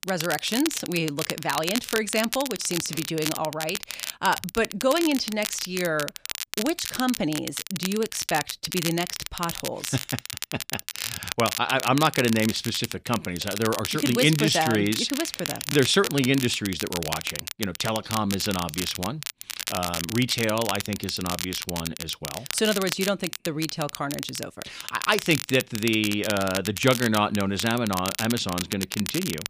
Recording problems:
crackle, like an old record; loud; 6 dB below the speech

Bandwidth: 15 kHz